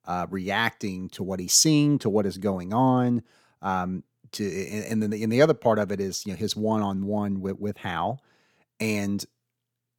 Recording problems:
none

